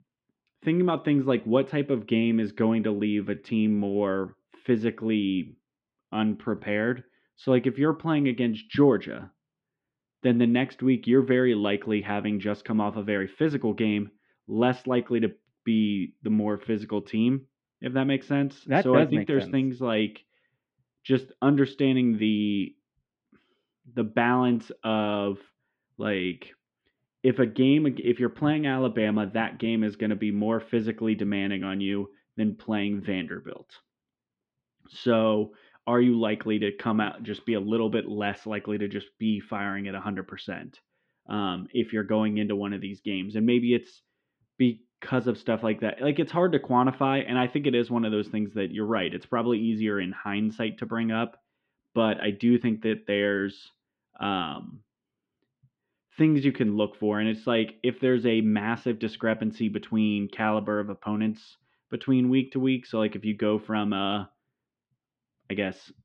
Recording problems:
muffled; very; fading above 3 kHz

